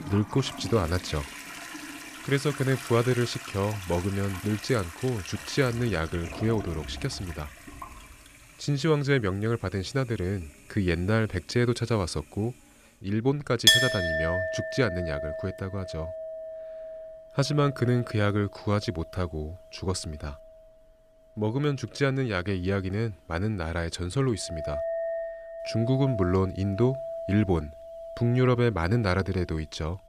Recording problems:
household noises; loud; throughout; 4 dB below the speech

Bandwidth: 14.5 kHz